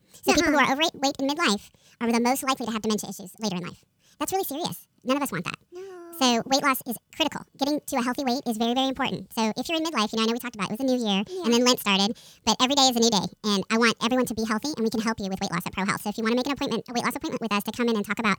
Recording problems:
wrong speed and pitch; too fast and too high; 1.6 times normal speed

